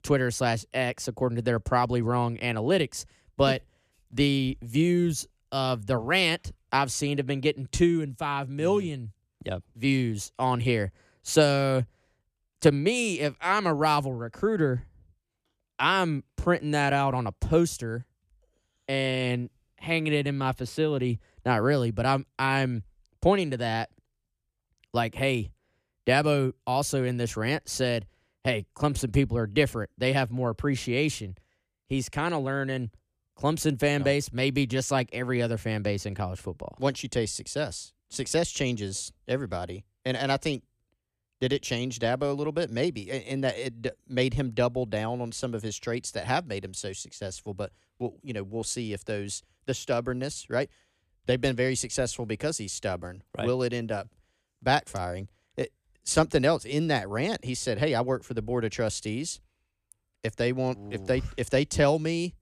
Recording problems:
none

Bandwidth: 14.5 kHz